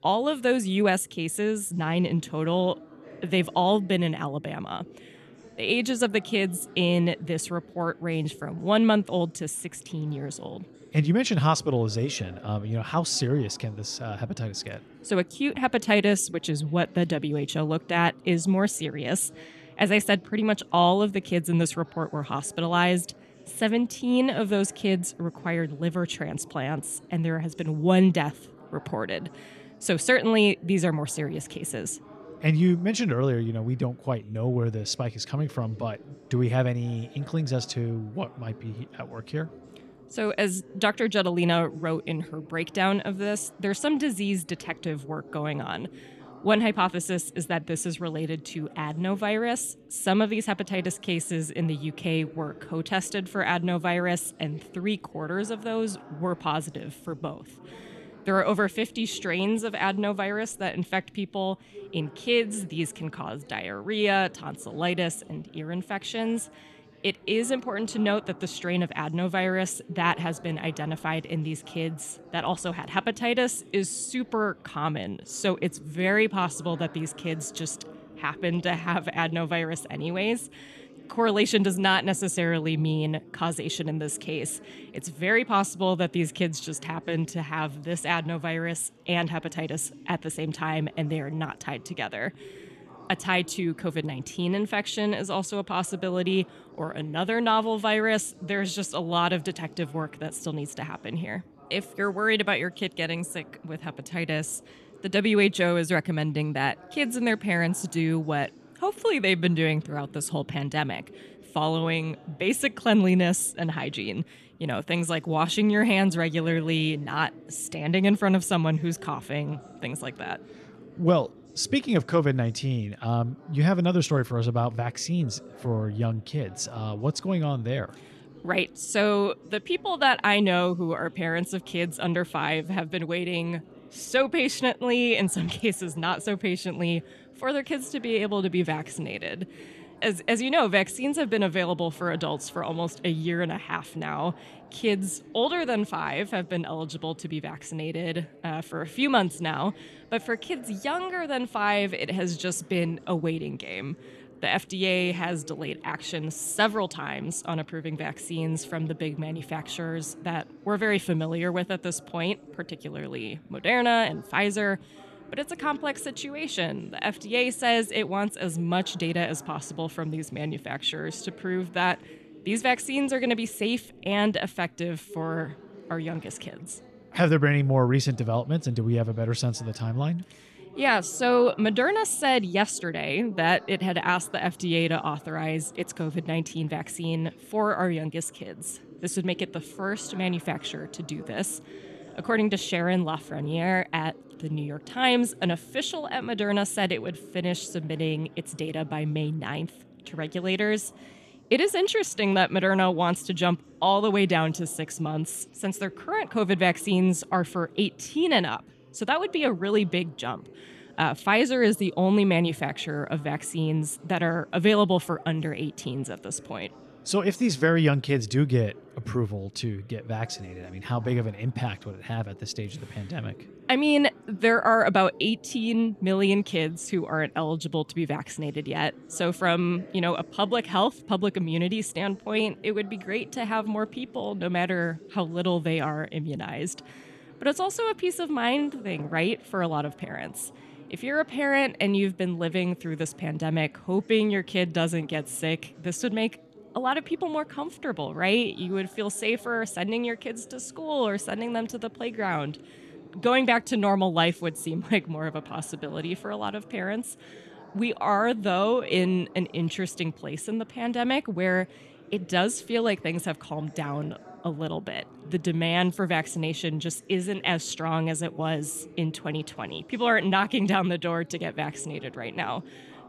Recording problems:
background chatter; faint; throughout; 3 voices, 20 dB below the speech

